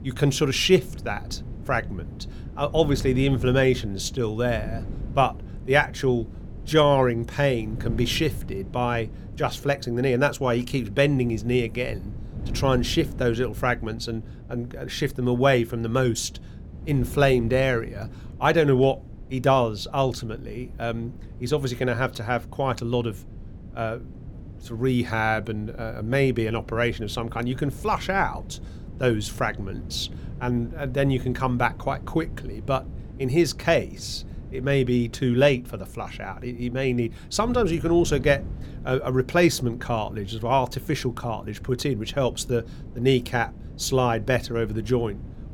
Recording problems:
wind noise on the microphone; occasional gusts; 25 dB below the speech

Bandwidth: 17.5 kHz